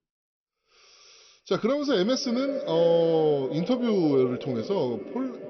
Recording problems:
echo of what is said; strong; throughout; 350 ms later, 10 dB below the speech
high frequencies cut off; noticeable; nothing above 5.5 kHz

